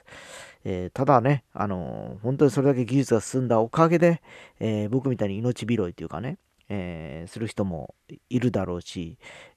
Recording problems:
none

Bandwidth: 13.5 kHz